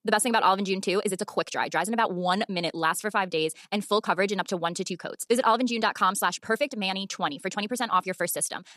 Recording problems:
wrong speed, natural pitch; too fast; 1.5 times normal speed

